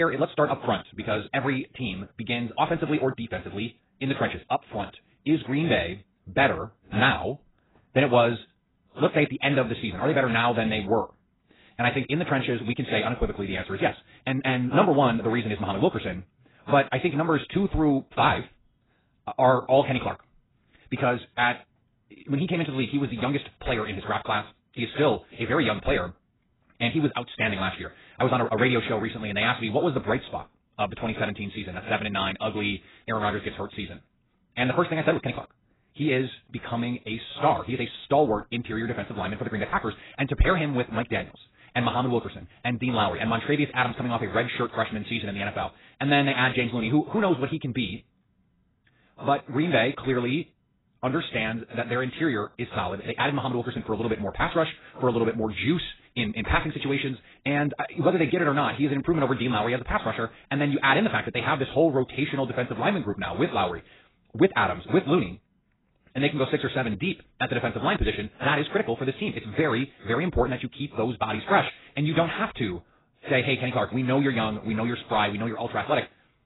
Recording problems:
garbled, watery; badly; nothing above 4 kHz
wrong speed, natural pitch; too fast; 1.7 times normal speed
abrupt cut into speech; at the start

